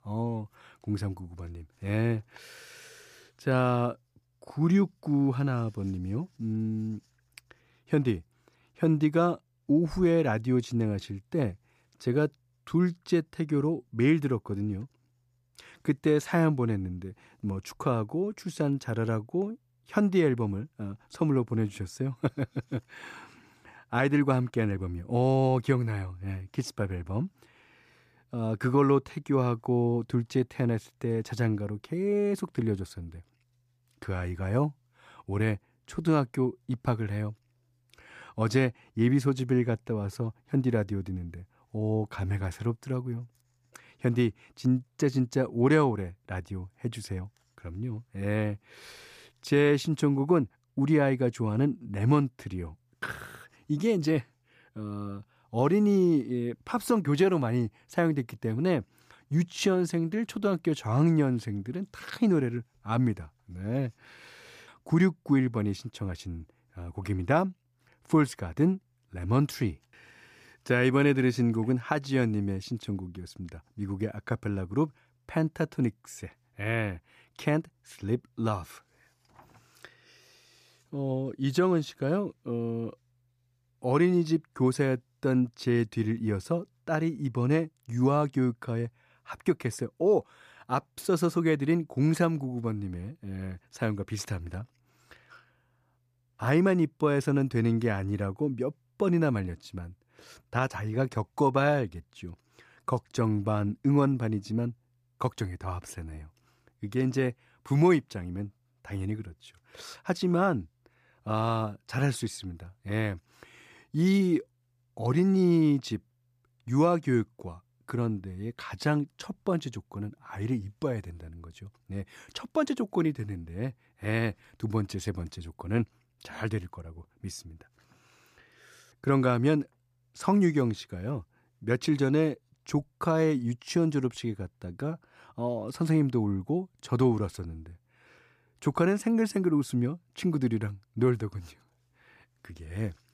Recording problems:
none

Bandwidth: 14.5 kHz